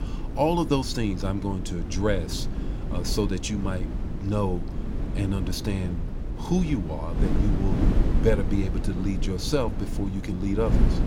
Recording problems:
wind noise on the microphone; heavy; 8 dB below the speech

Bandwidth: 17 kHz